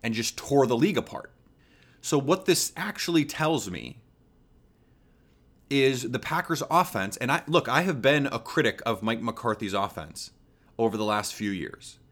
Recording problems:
none

